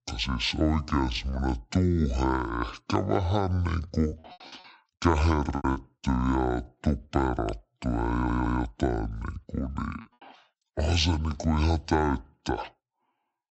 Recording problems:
wrong speed and pitch; too slow and too low; 0.6 times normal speed
choppy; very; from 4 to 6 s and at 10 s; 15% of the speech affected
audio stuttering; at 8 s

